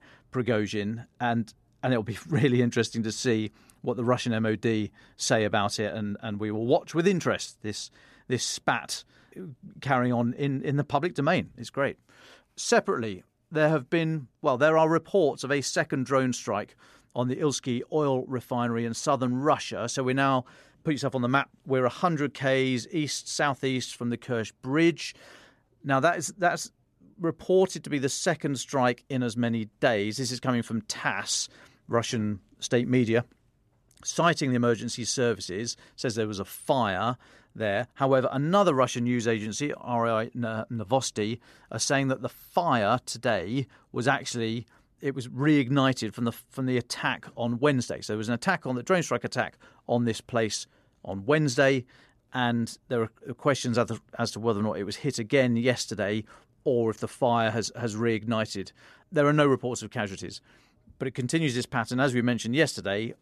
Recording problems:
none

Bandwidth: 13.5 kHz